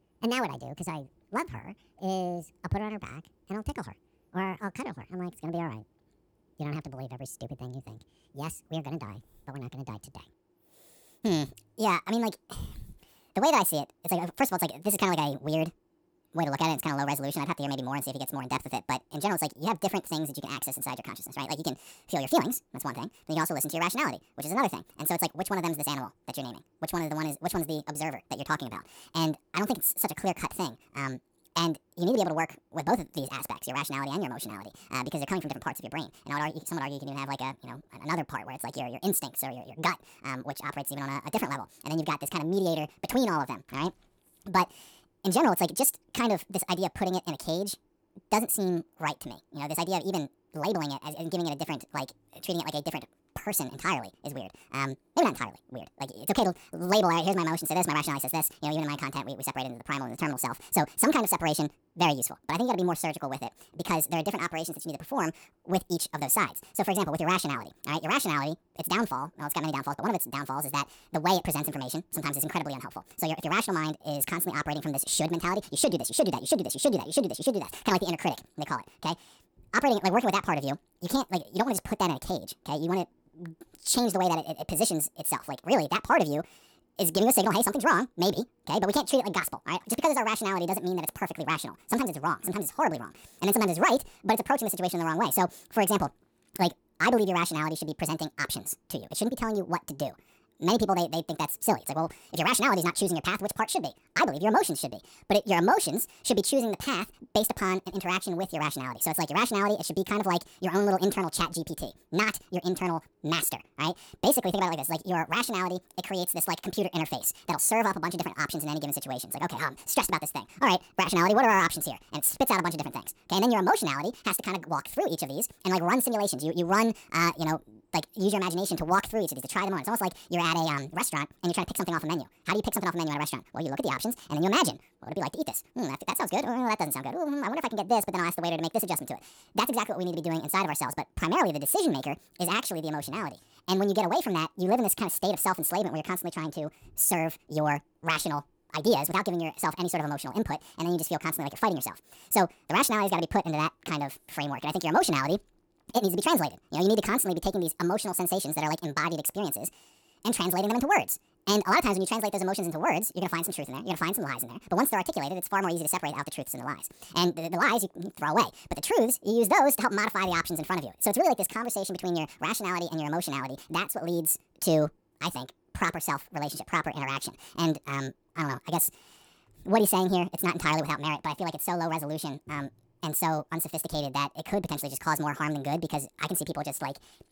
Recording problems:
wrong speed and pitch; too fast and too high; 1.7 times normal speed

